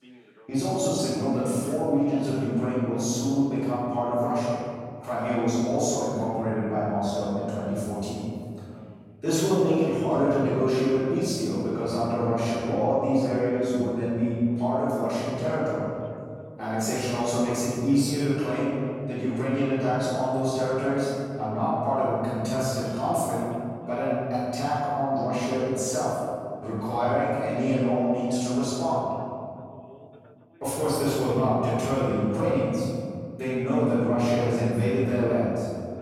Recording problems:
room echo; strong; dies away in 2.3 s
off-mic speech; far
voice in the background; faint; throughout; 30 dB below the speech

